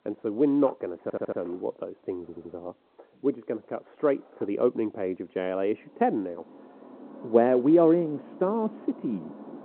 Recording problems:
muffled; very; fading above 1.5 kHz
phone-call audio
traffic noise; noticeable; throughout; 20 dB below the speech
household noises; faint; until 6 s; 25 dB below the speech
audio stuttering; at 1 s and at 2 s

